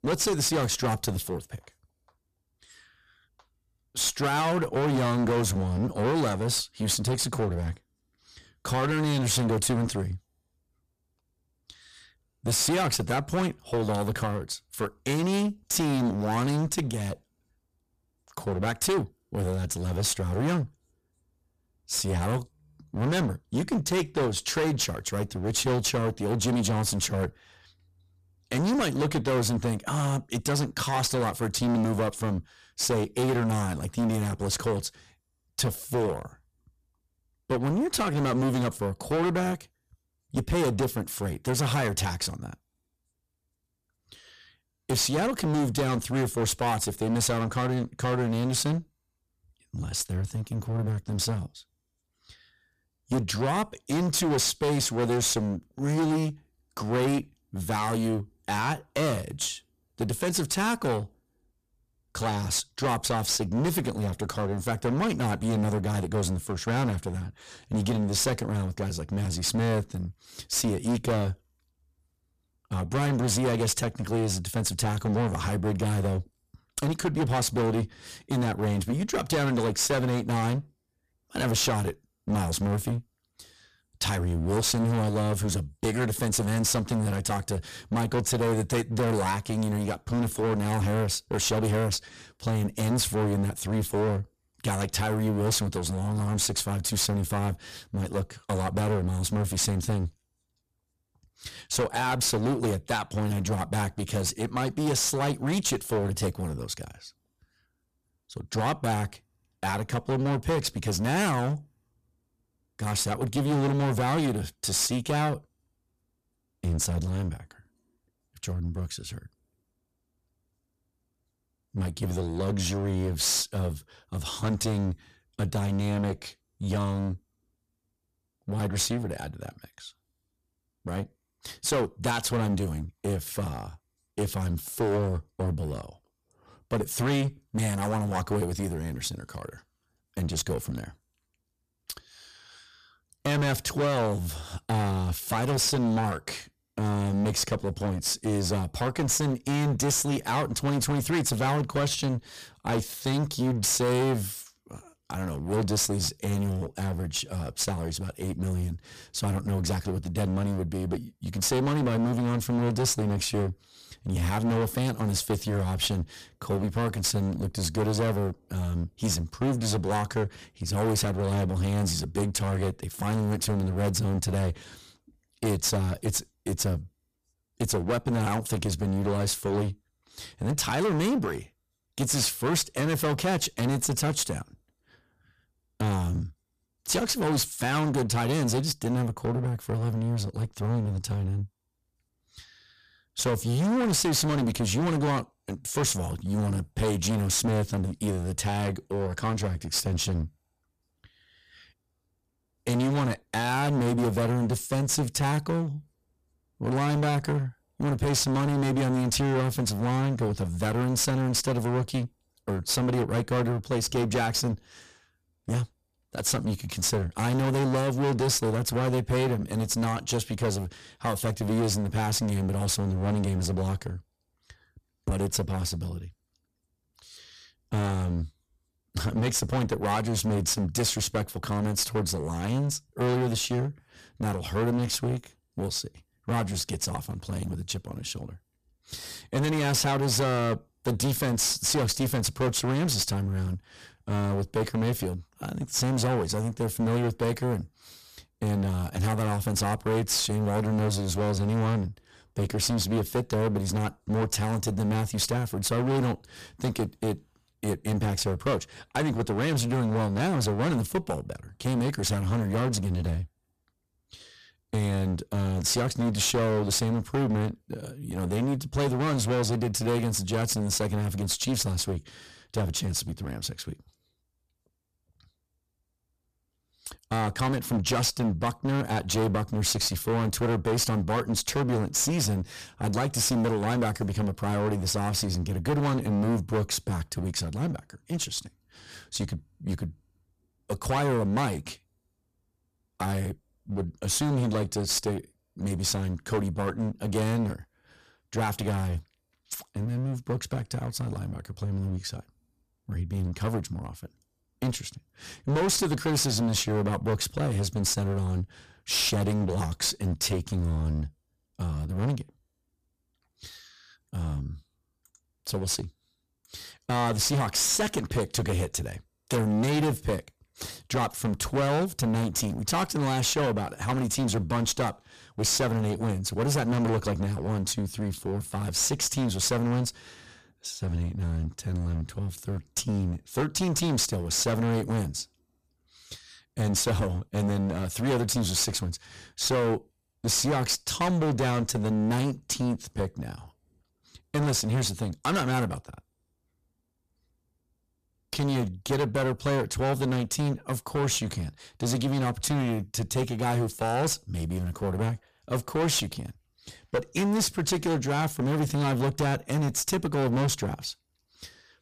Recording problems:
distortion; heavy; 17% of the sound clipped

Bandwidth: 14.5 kHz